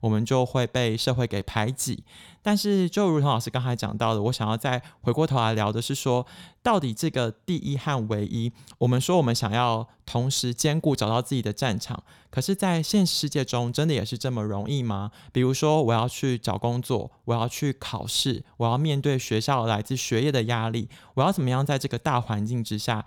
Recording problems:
none

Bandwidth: 18.5 kHz